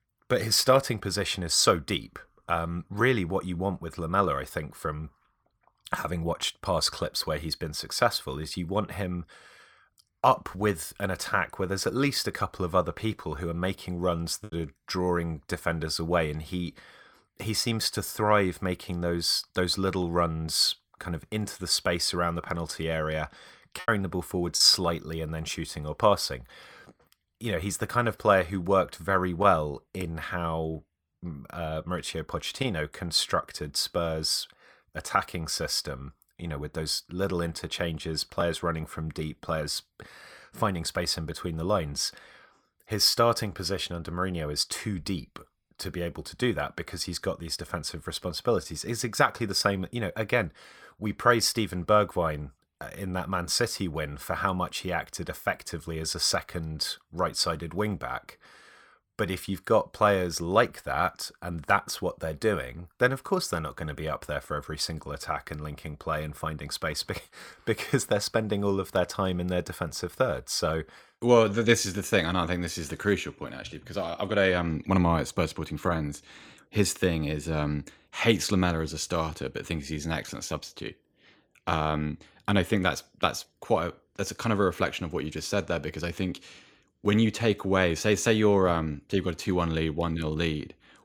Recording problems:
choppy; very; at 14 s and at 24 s; 8% of the speech affected

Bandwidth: 18.5 kHz